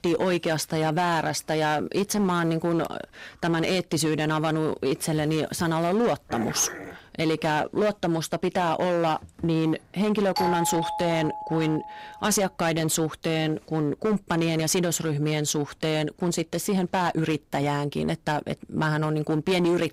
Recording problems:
distortion; slight; 12% of the sound clipped
dog barking; noticeable; at 6.5 s; peak 8 dB below the speech
doorbell; noticeable; from 10 to 12 s; peak 1 dB below the speech

